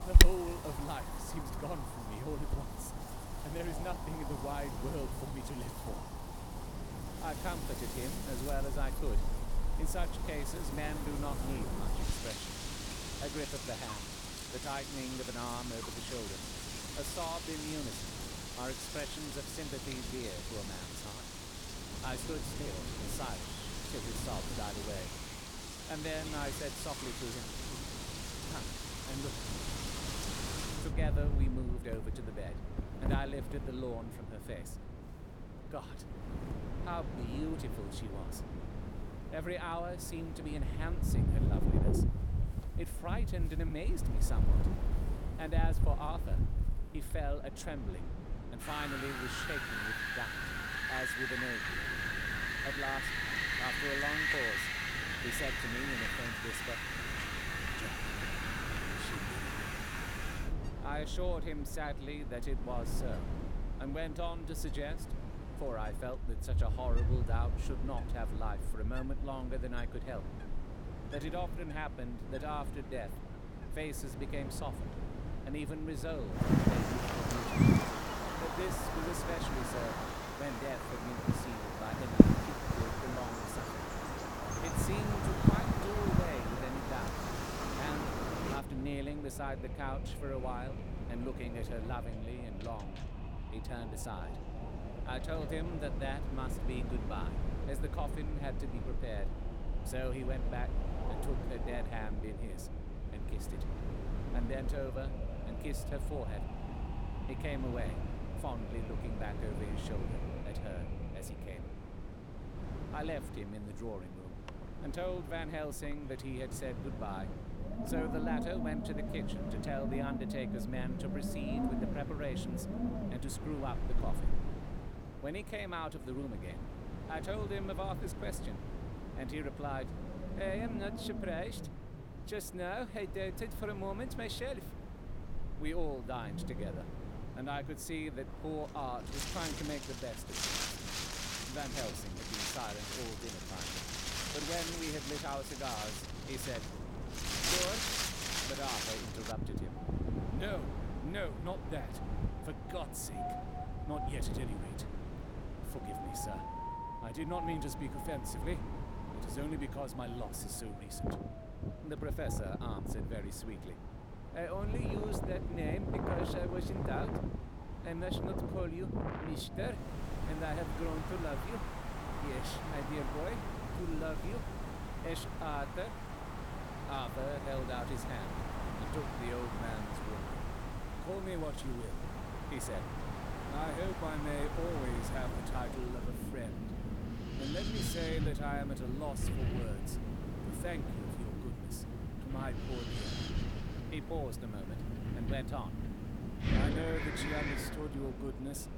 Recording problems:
wind in the background; very loud; throughout; 4 dB above the speech

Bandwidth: 18.5 kHz